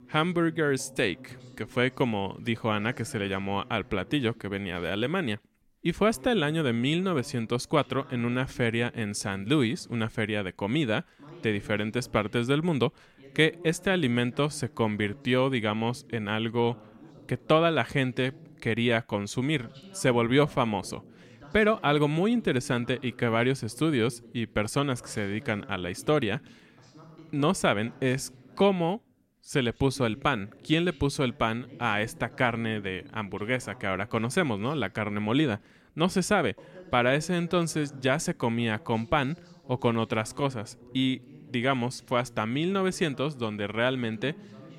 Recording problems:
voice in the background; faint; throughout; 20 dB below the speech

